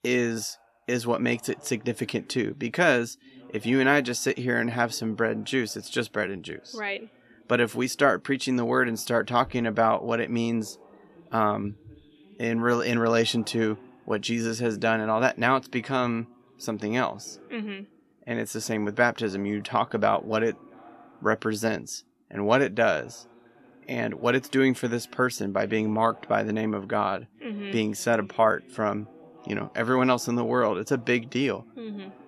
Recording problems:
voice in the background; faint; throughout; 25 dB below the speech

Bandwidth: 13.5 kHz